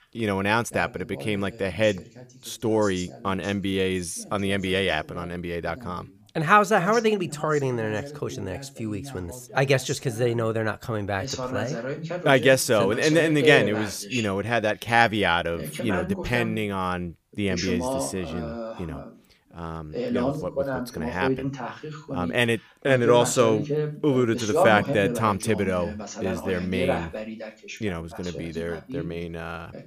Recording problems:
voice in the background; loud; throughout; 7 dB below the speech

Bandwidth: 15 kHz